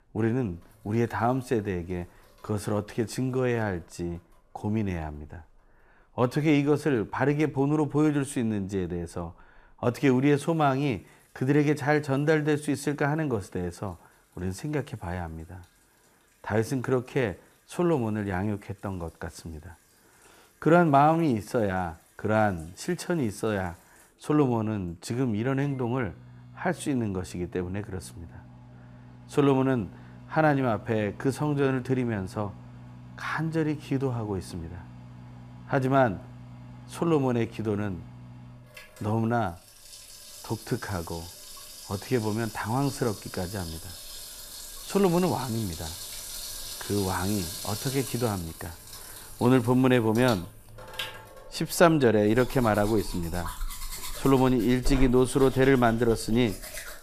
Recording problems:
household noises; noticeable; throughout; 15 dB below the speech

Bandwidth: 14.5 kHz